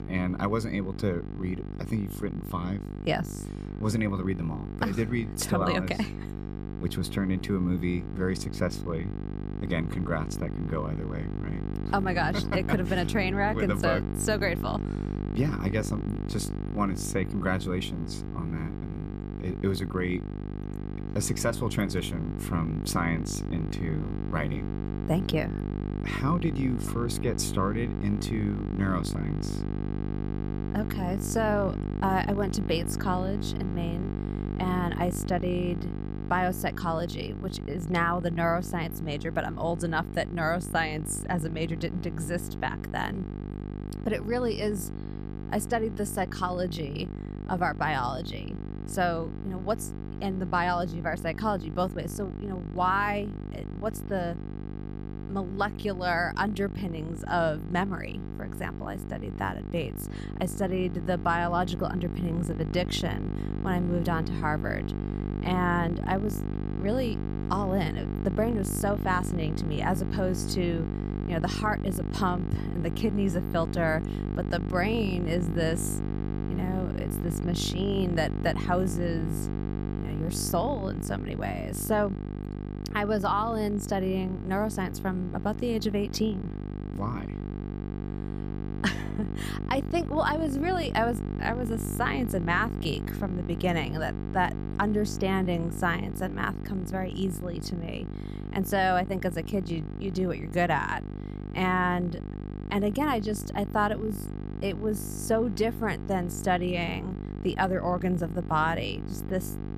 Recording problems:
electrical hum; noticeable; throughout; 50 Hz, 10 dB below the speech

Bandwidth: 14.5 kHz